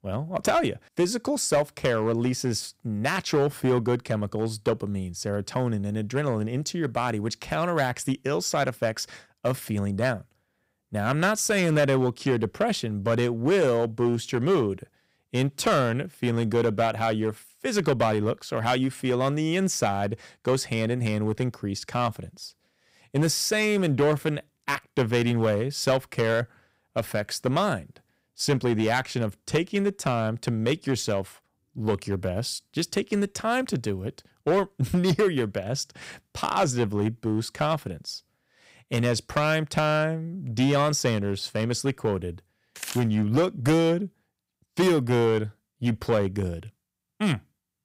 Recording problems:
distortion; slight; 4% of the sound clipped

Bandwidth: 15.5 kHz